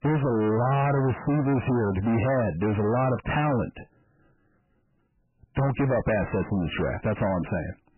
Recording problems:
distortion; heavy; 6 dB below the speech
garbled, watery; badly; nothing above 3 kHz

